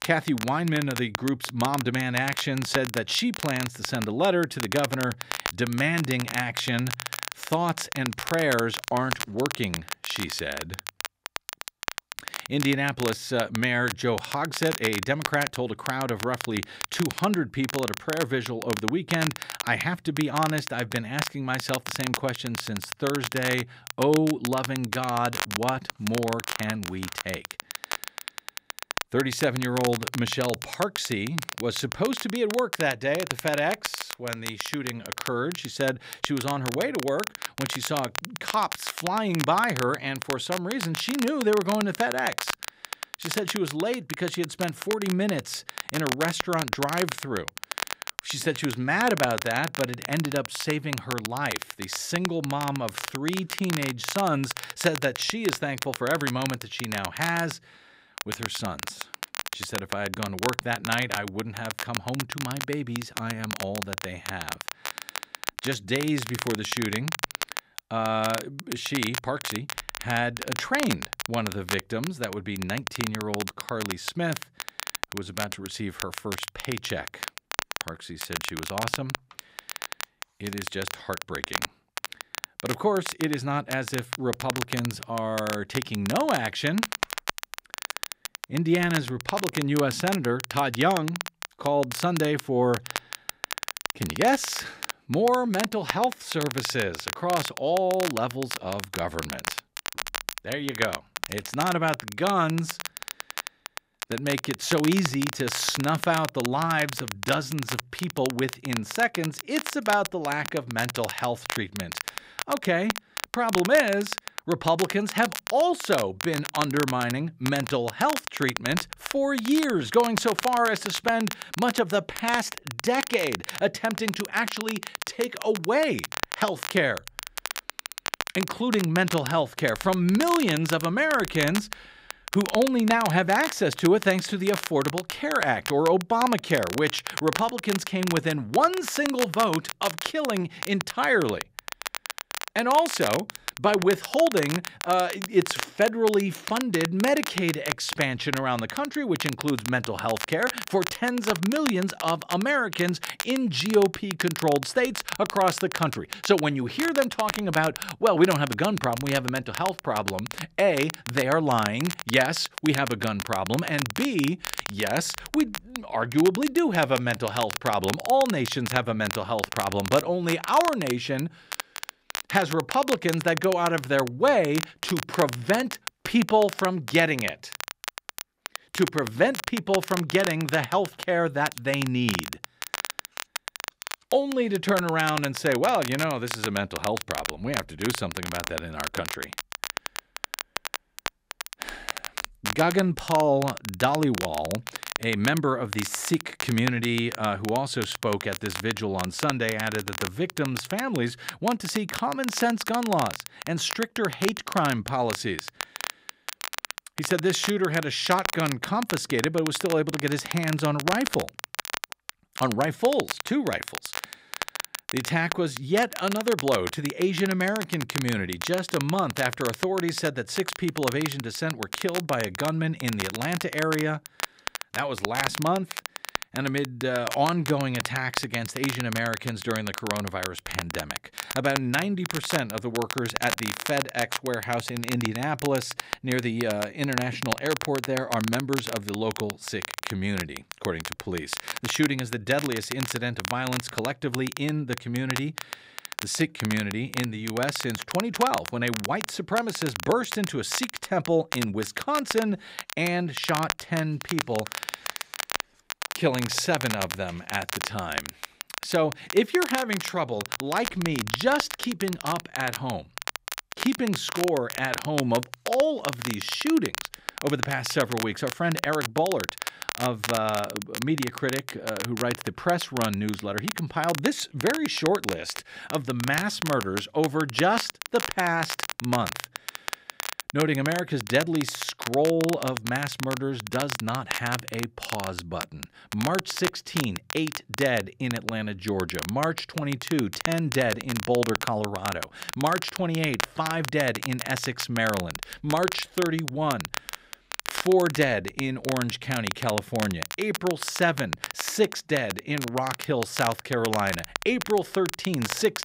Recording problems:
crackle, like an old record; loud; 7 dB below the speech

